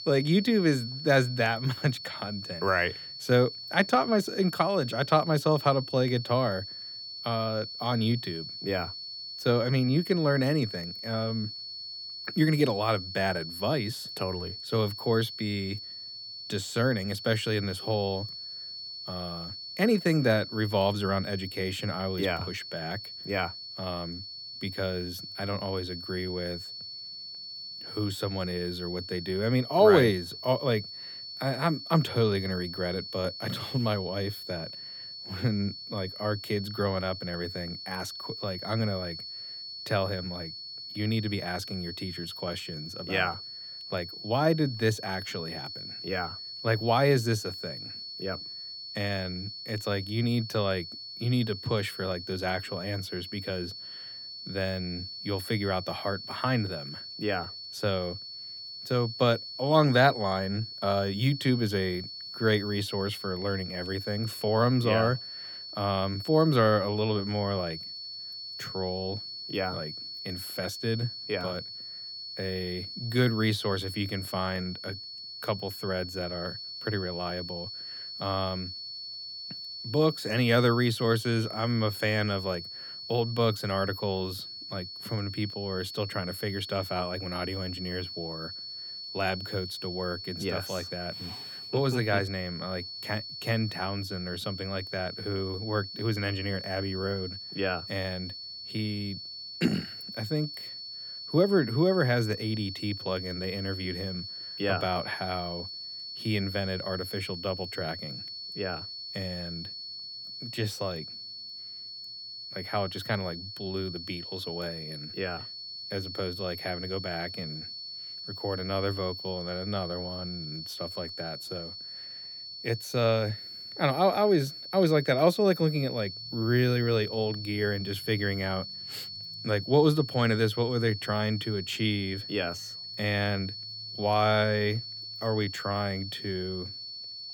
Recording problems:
high-pitched whine; loud; throughout; 4.5 kHz, 8 dB below the speech

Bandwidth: 18 kHz